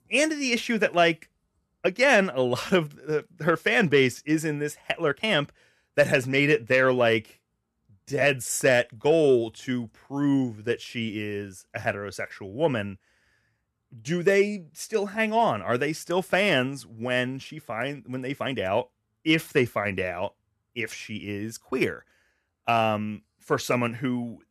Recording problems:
uneven, jittery; slightly; from 2 to 20 s

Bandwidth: 14 kHz